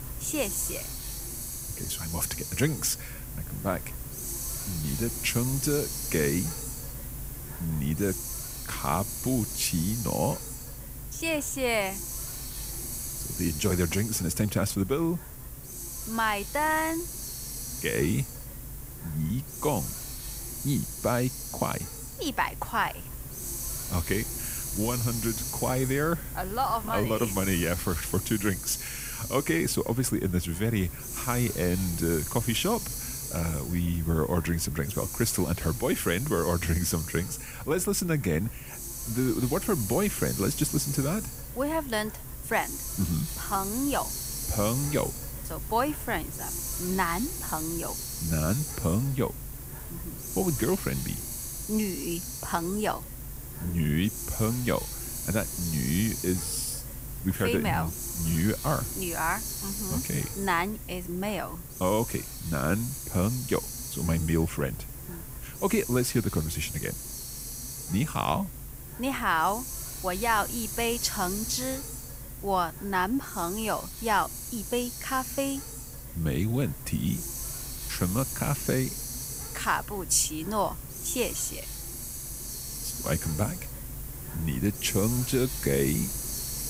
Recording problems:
hiss; loud; throughout; 6 dB below the speech

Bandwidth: 15.5 kHz